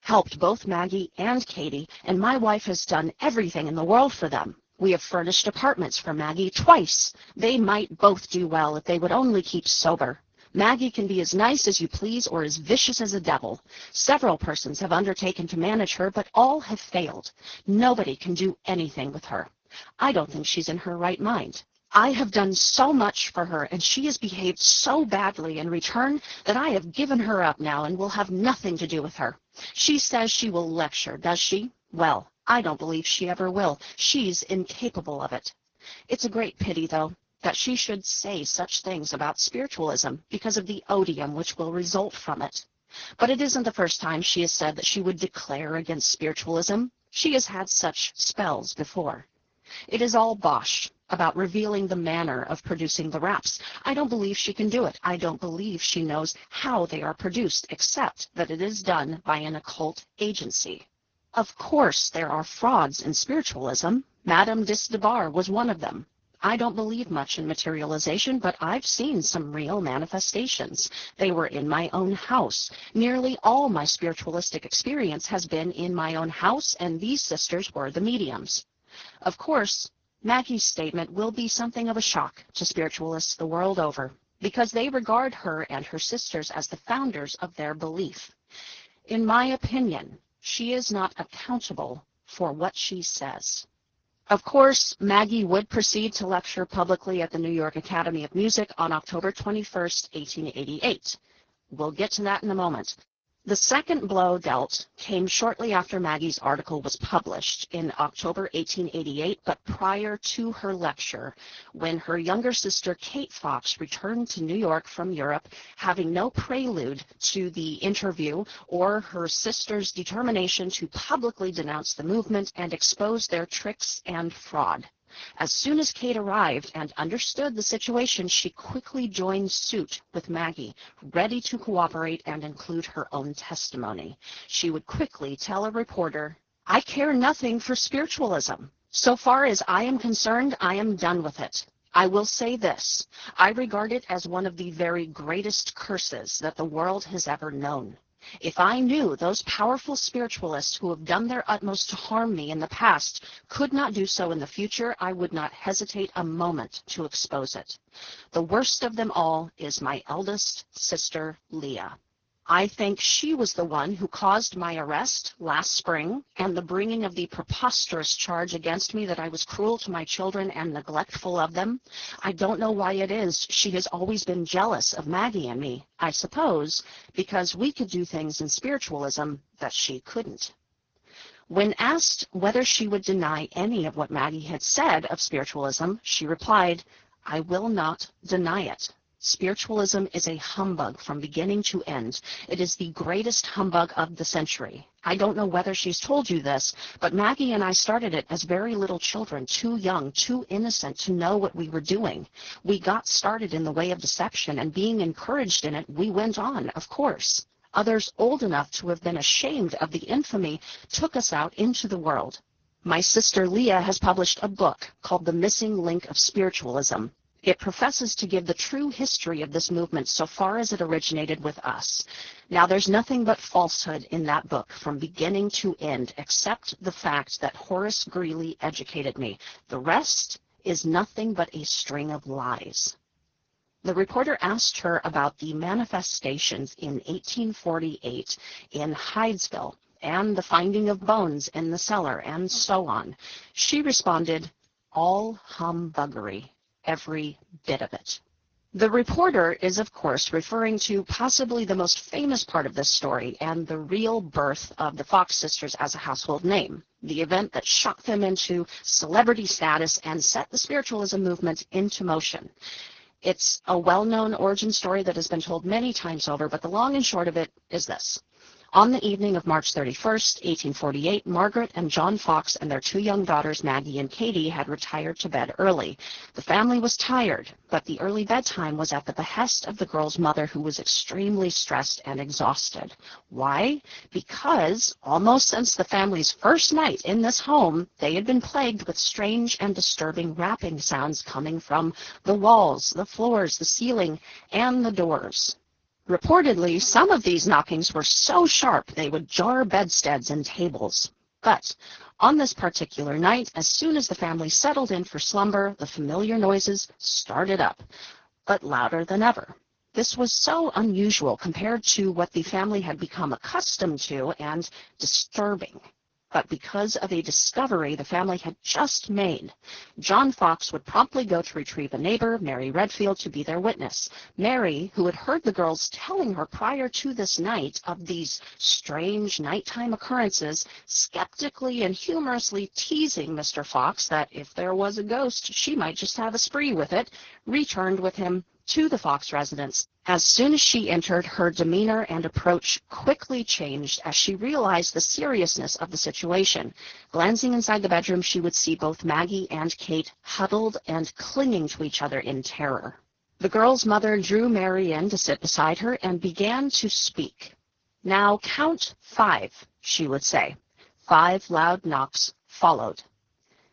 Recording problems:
garbled, watery; badly; nothing above 6.5 kHz

